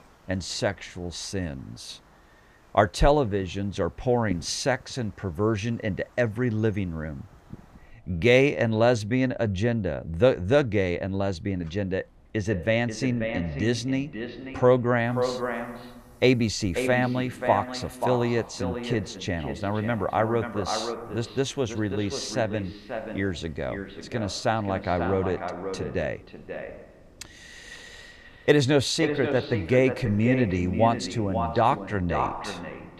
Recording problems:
echo of what is said; strong; from 12 s on; 540 ms later, 8 dB below the speech
wind in the background; faint; throughout; 30 dB below the speech

